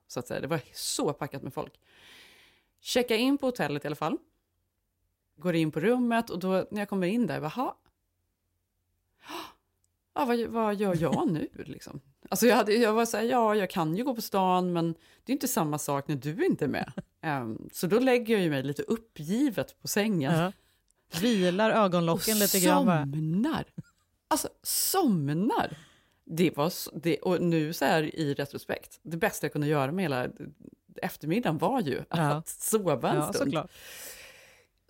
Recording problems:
none

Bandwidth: 16 kHz